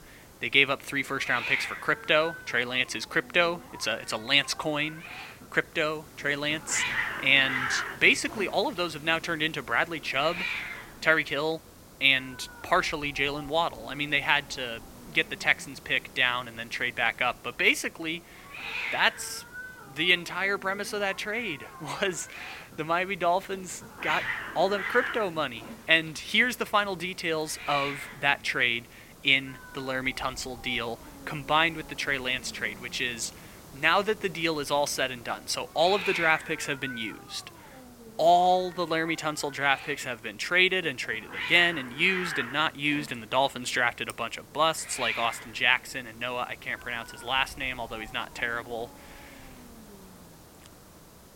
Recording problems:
thin; somewhat; fading below 1 kHz
hiss; noticeable; throughout; 10 dB below the speech

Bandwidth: 16.5 kHz